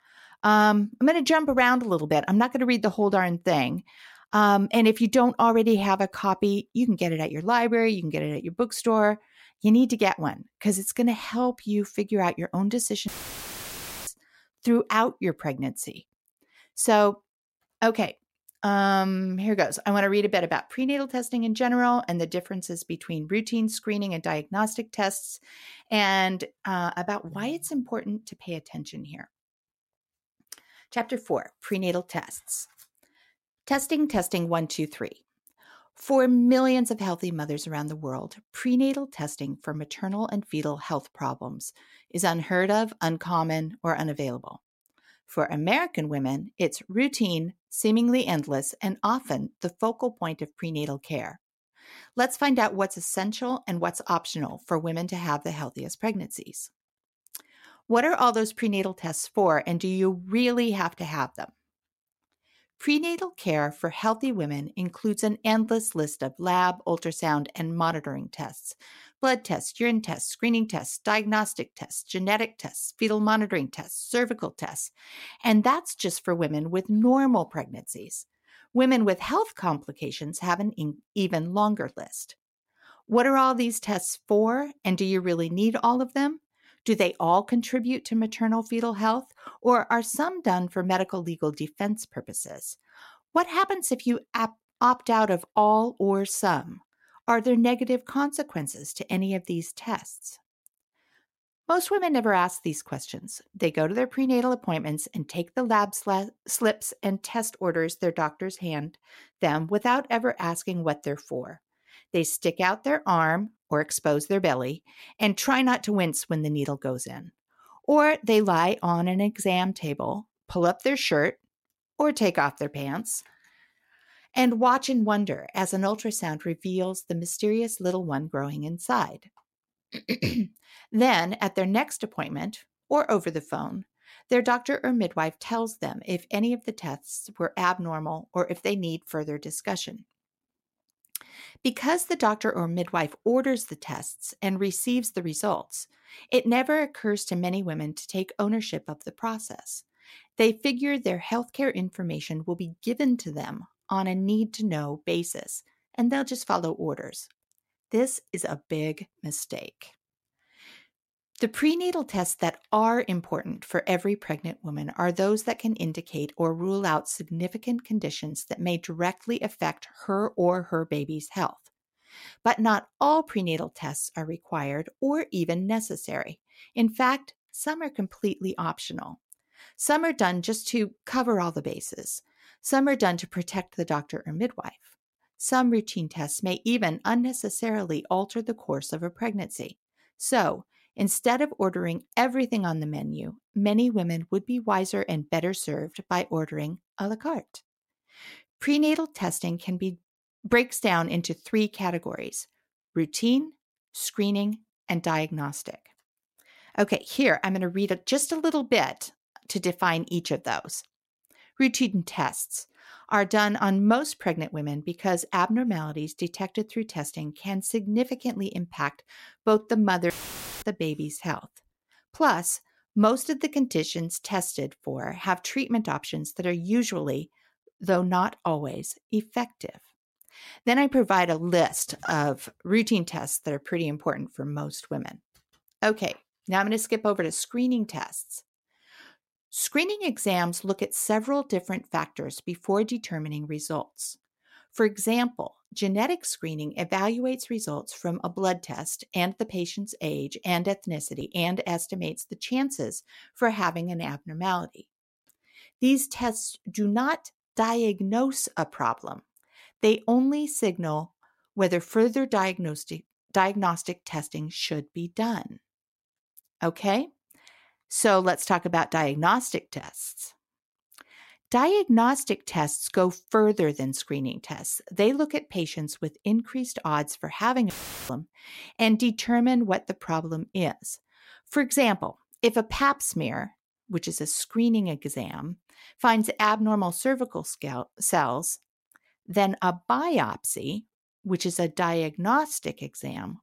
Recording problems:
audio cutting out; filled with static; at 13 s for 1 s, at 3:40 for 0.5 s and at 4:38

